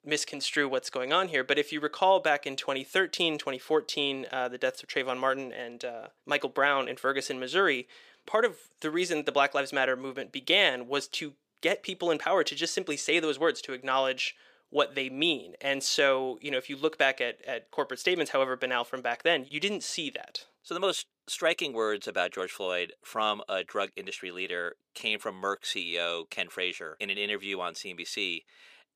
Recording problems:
thin; somewhat; fading below 400 Hz

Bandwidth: 15 kHz